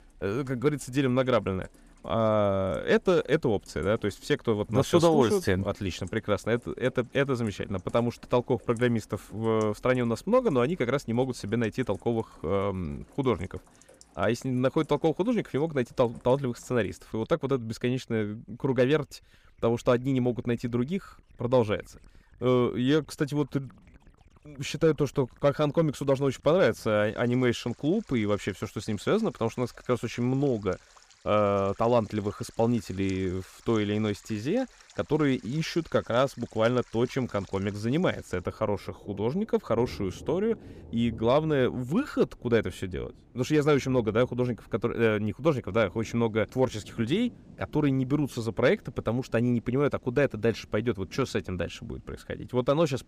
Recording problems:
rain or running water; faint; throughout; 25 dB below the speech

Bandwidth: 15 kHz